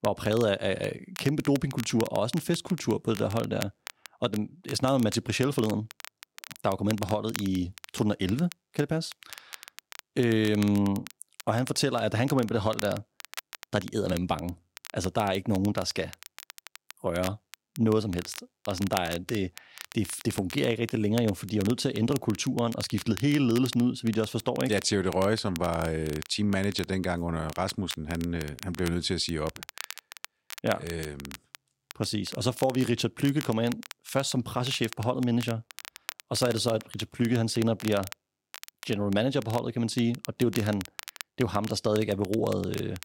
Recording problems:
crackle, like an old record; noticeable; 15 dB below the speech

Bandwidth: 16 kHz